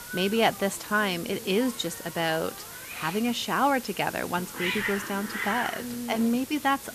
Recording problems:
hiss; loud; throughout; 8 dB below the speech

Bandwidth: 14.5 kHz